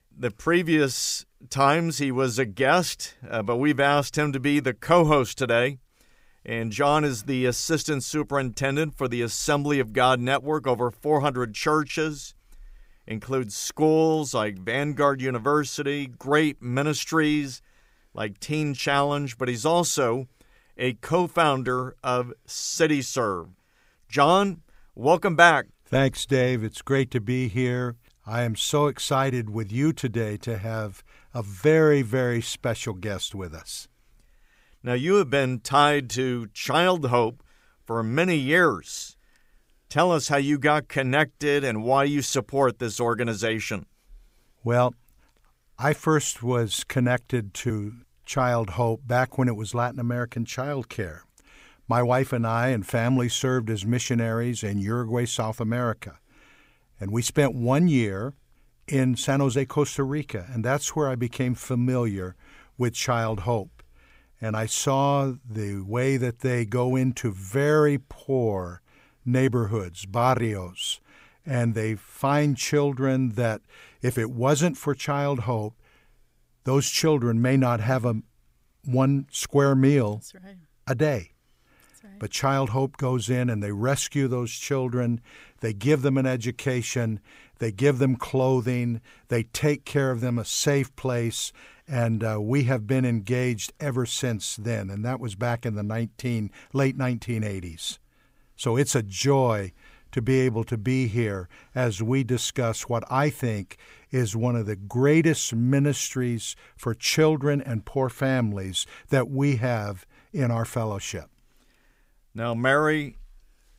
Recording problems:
none

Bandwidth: 15.5 kHz